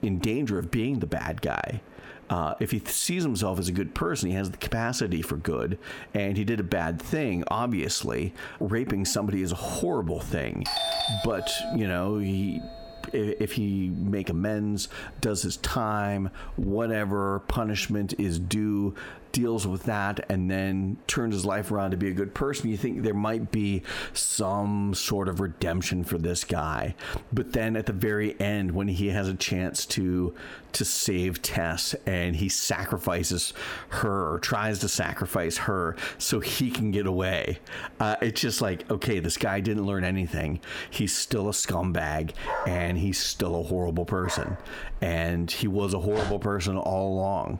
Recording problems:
squashed, flat; heavily
doorbell; loud; from 10 to 17 s; peak 2 dB above the speech
dog barking; noticeable; from 42 to 45 s and at 46 s; peak 3 dB below the speech

